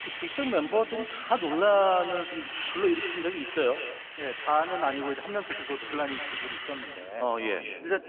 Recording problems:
echo of what is said; strong; throughout; 190 ms later, 10 dB below the speech
phone-call audio; nothing above 3.5 kHz
traffic noise; loud; throughout; 7 dB below the speech

